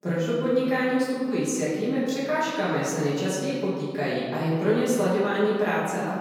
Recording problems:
room echo; strong; dies away in 2.1 s
off-mic speech; far

